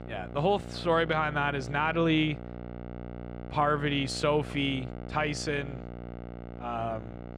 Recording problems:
electrical hum; noticeable; throughout; 60 Hz, 15 dB below the speech

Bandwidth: 15 kHz